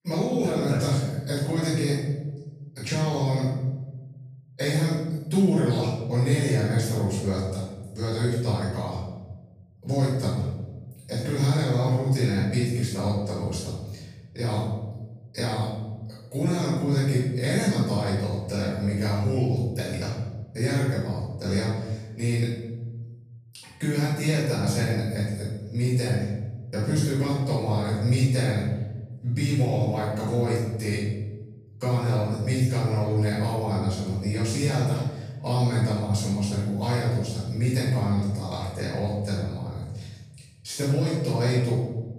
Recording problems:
room echo; strong; dies away in 1.2 s
off-mic speech; far

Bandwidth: 15 kHz